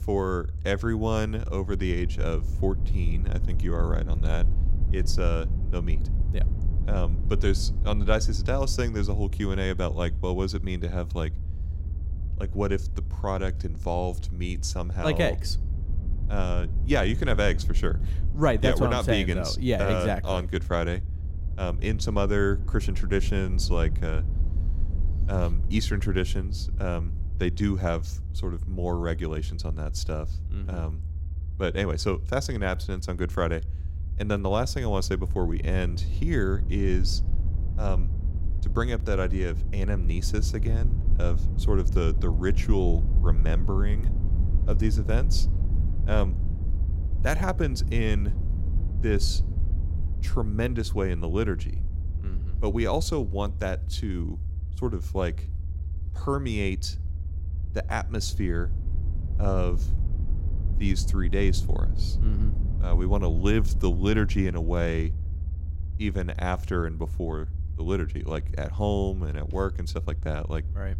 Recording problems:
low rumble; noticeable; throughout; 15 dB below the speech

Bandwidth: 16 kHz